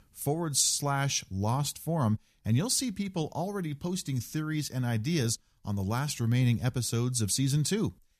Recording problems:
none

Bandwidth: 14.5 kHz